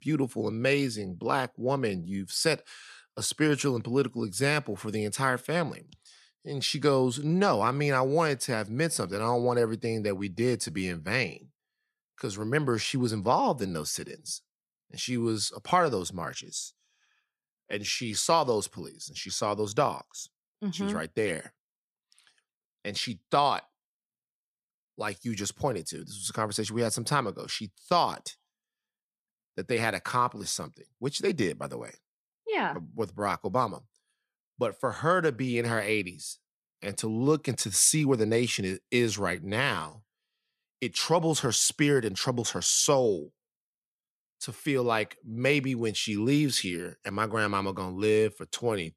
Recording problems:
none

